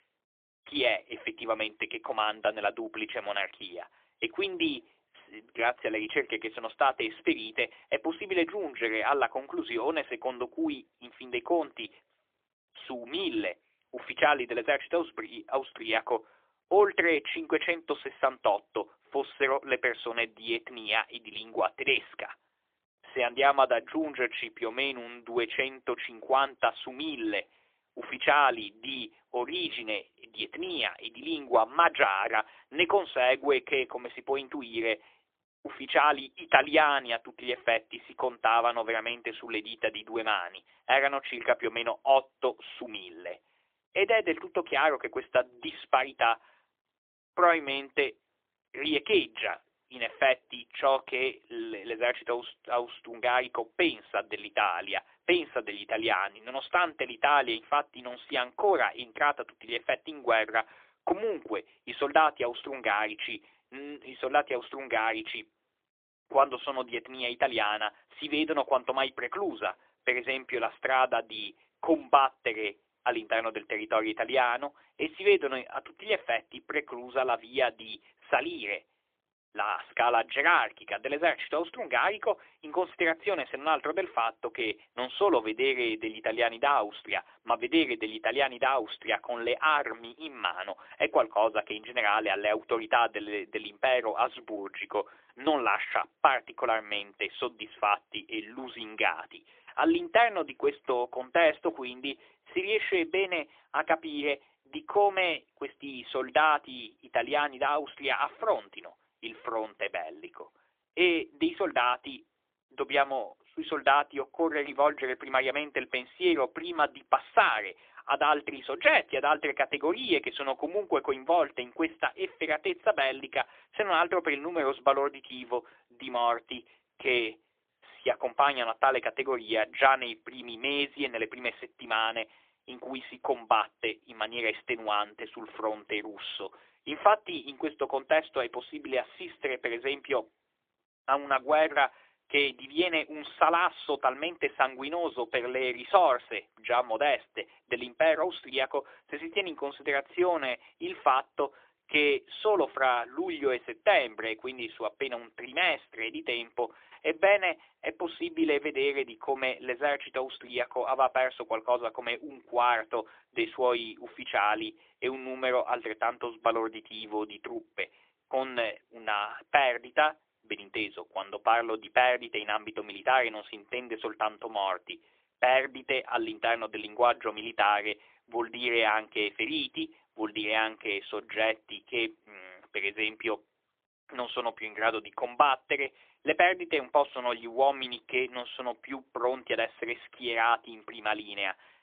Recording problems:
phone-call audio; poor line; nothing above 3.5 kHz

